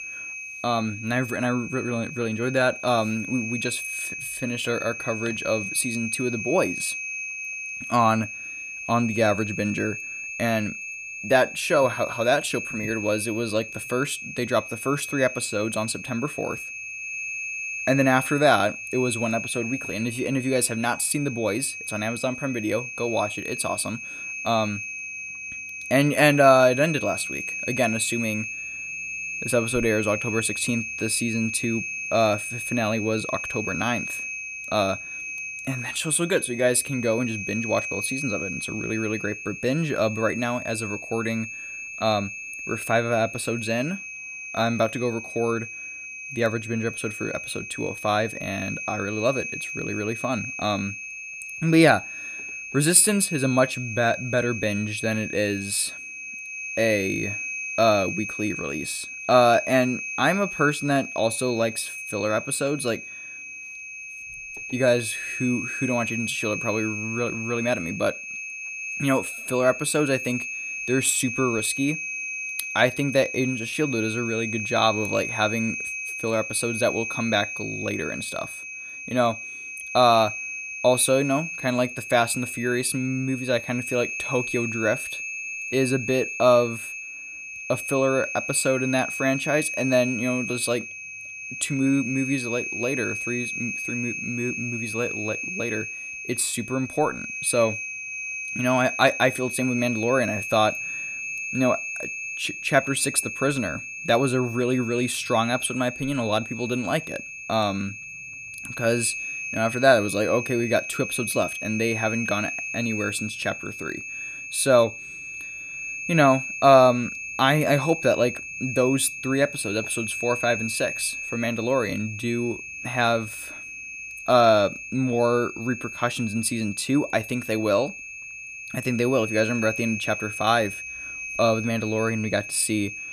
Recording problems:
high-pitched whine; loud; throughout; 2.5 kHz, 7 dB below the speech

